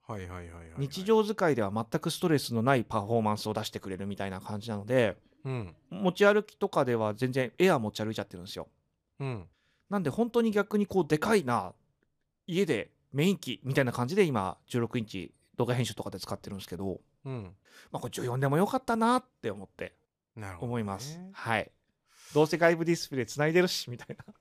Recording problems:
none

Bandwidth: 14.5 kHz